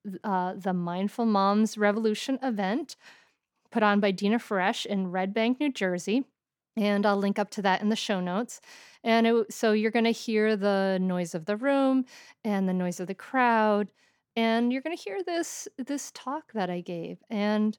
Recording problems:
none

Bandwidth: 18 kHz